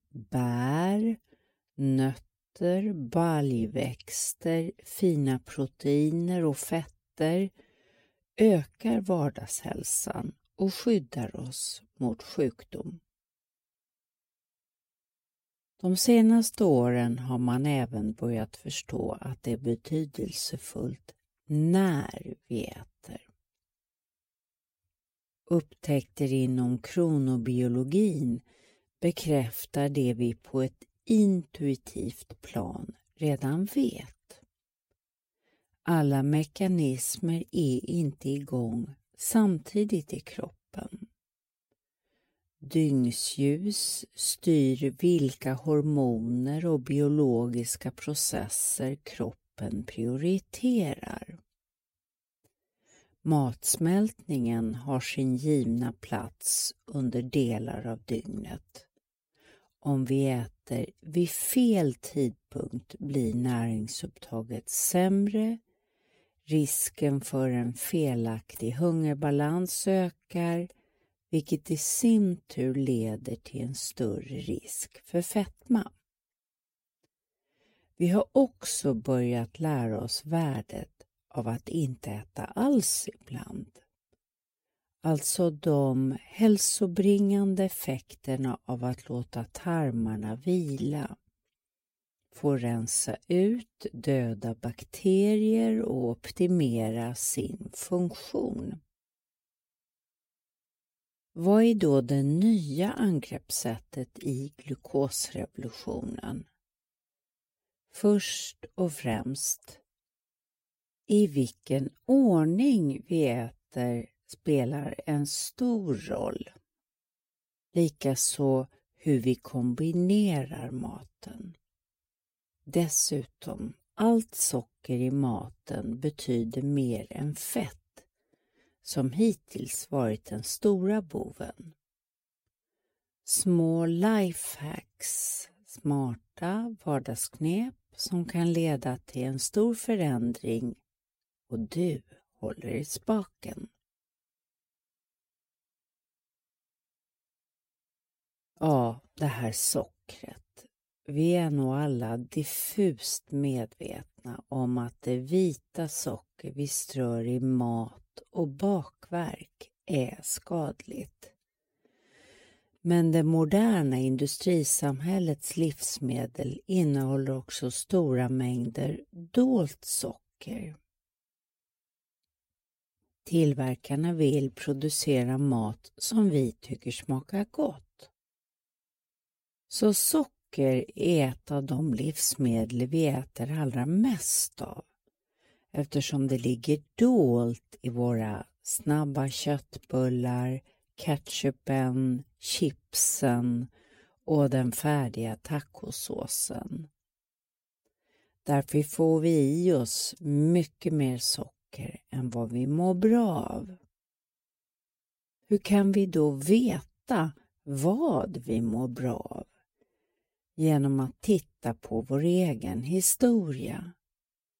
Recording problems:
wrong speed, natural pitch; too slow; 0.7 times normal speed

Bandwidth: 16 kHz